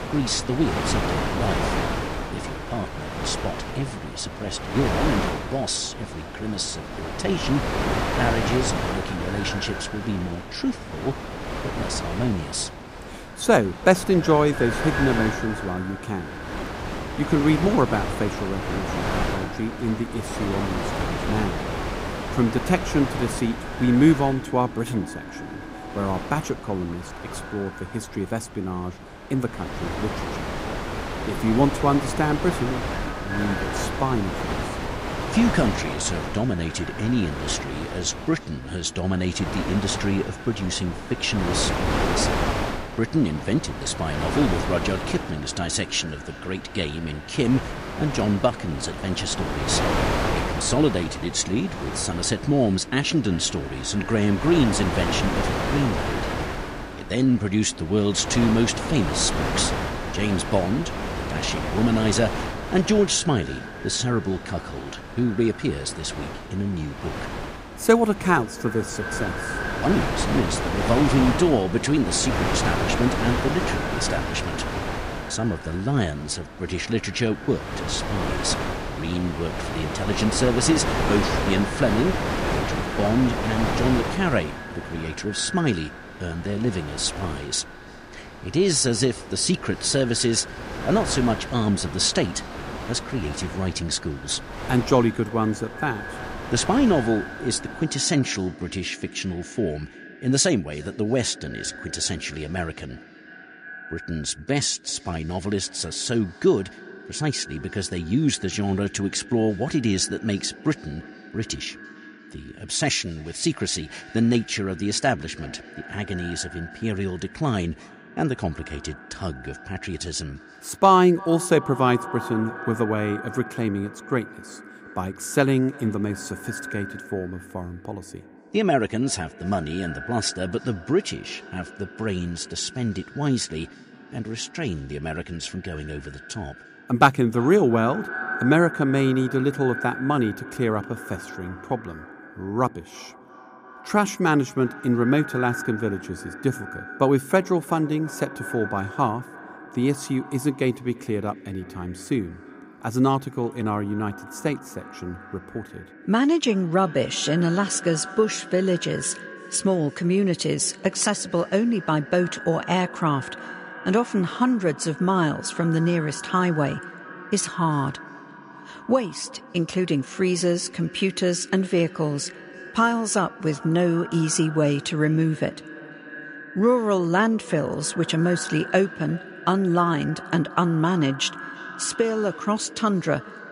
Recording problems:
echo of what is said; noticeable; throughout; 340 ms later, 15 dB below the speech
wind noise on the microphone; heavy; until 1:38; 4 dB below the speech

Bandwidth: 15.5 kHz